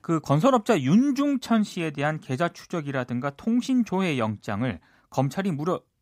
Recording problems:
none

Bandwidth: 15.5 kHz